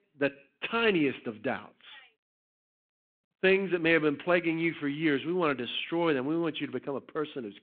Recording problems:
phone-call audio

